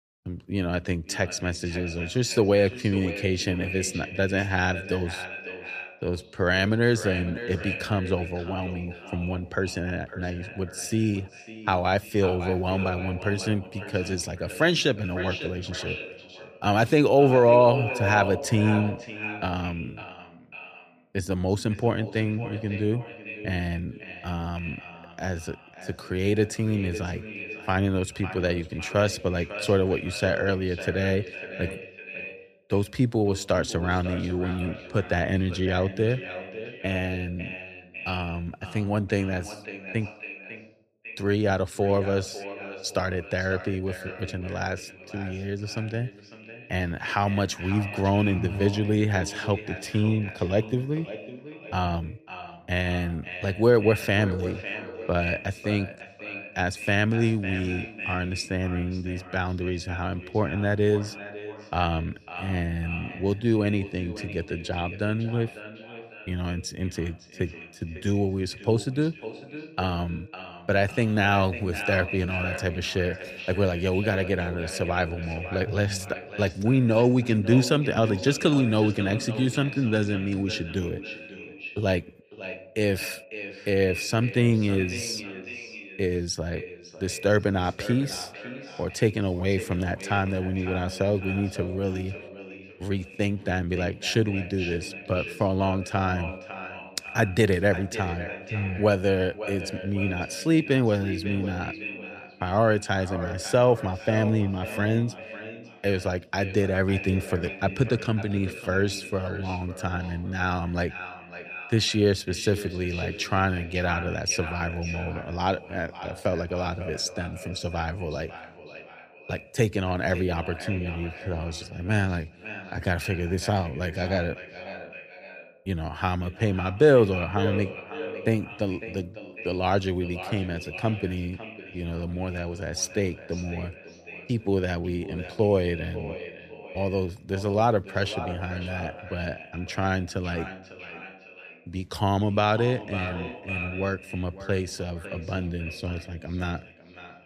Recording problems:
echo of what is said; strong; throughout; 550 ms later, 10 dB below the speech

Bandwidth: 14.5 kHz